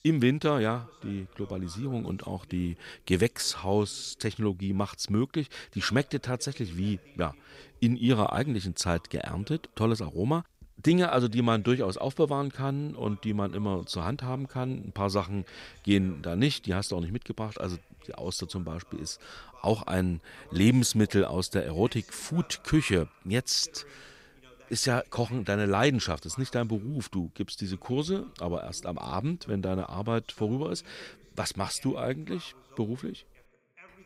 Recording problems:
voice in the background; faint; throughout; 25 dB below the speech

